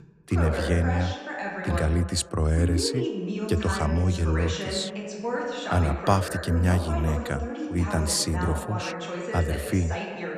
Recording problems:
voice in the background; loud; throughout; 6 dB below the speech

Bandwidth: 14.5 kHz